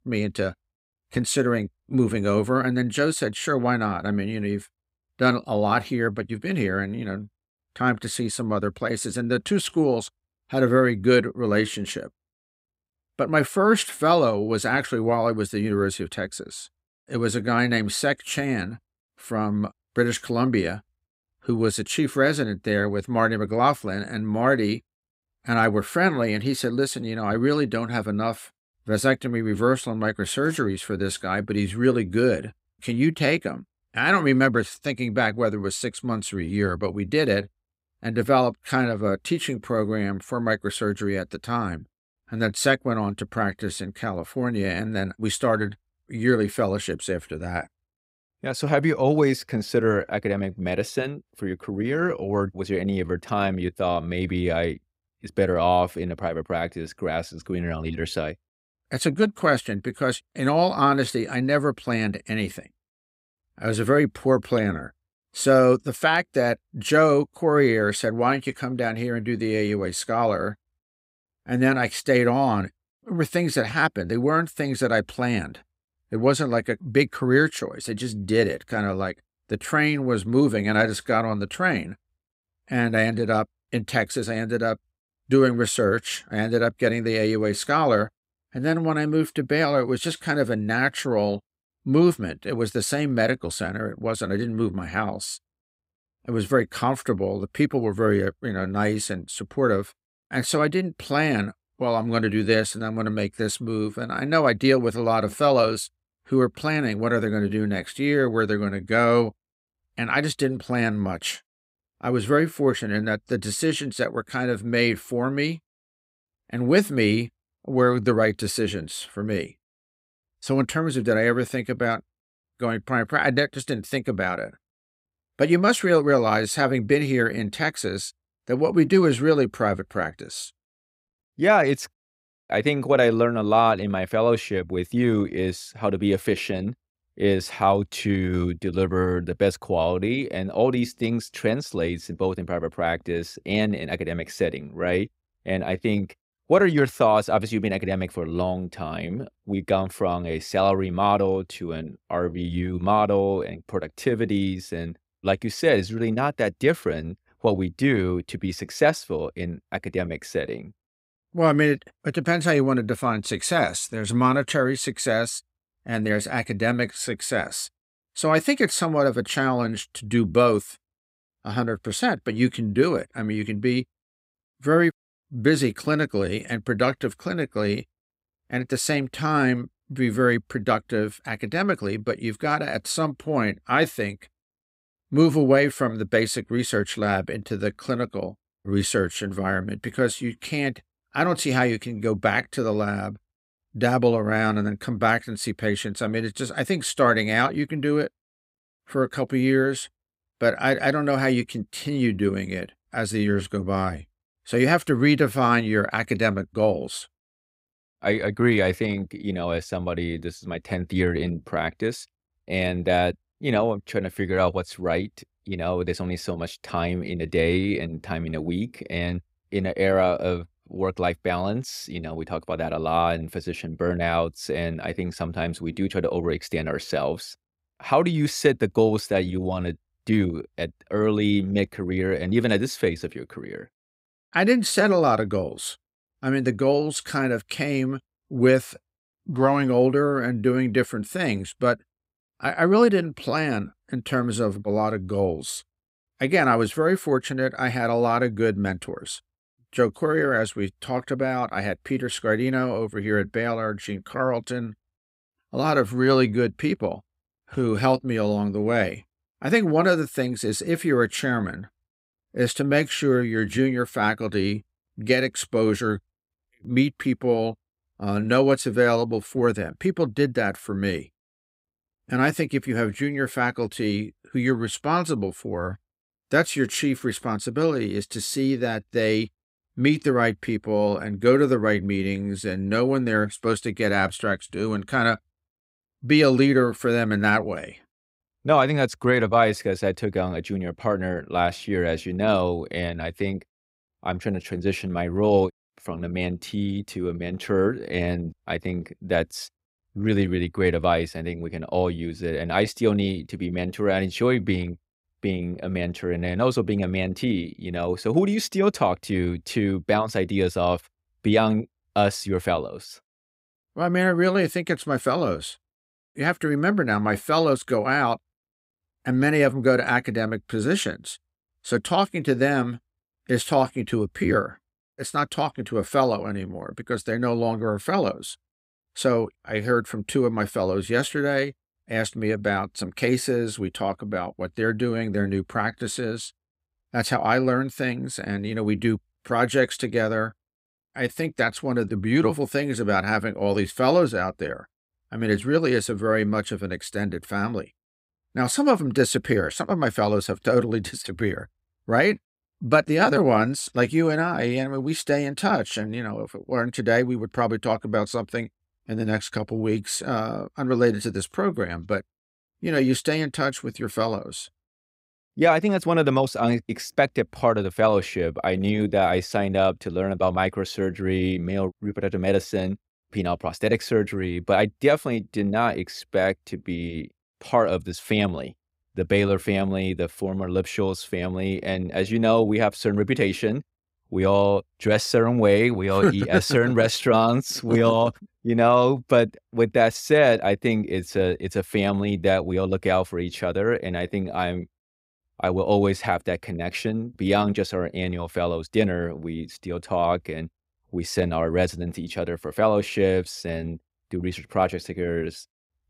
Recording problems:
none

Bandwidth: 15.5 kHz